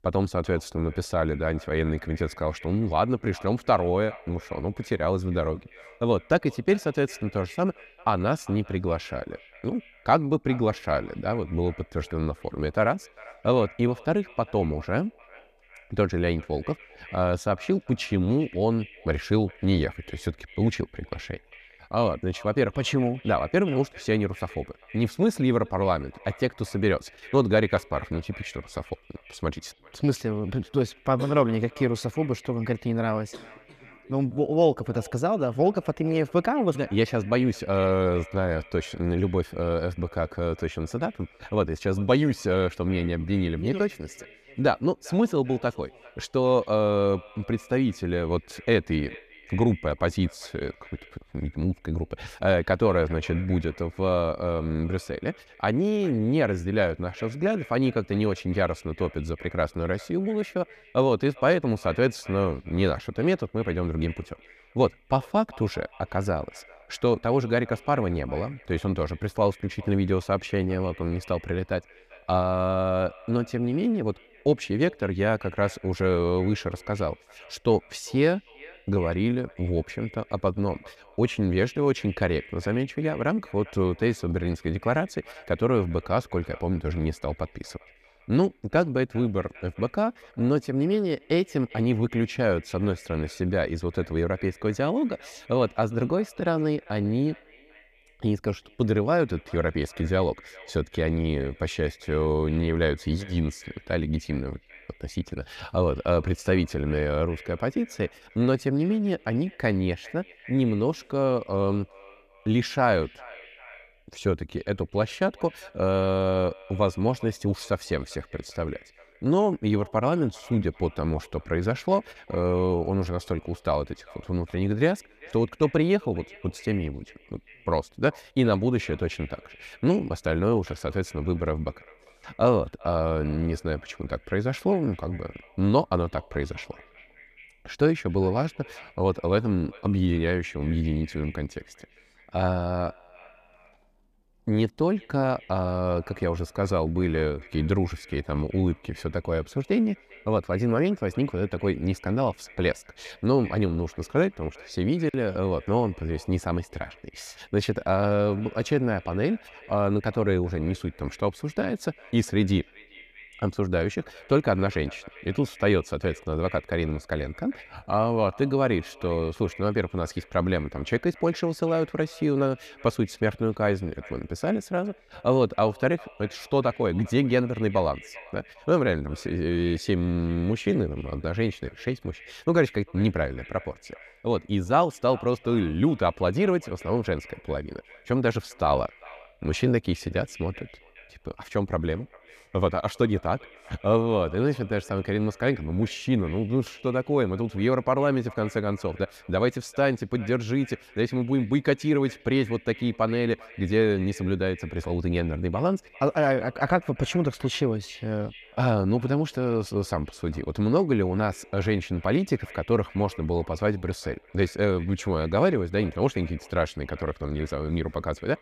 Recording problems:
echo of what is said; faint; throughout; 400 ms later, 20 dB below the speech

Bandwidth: 14.5 kHz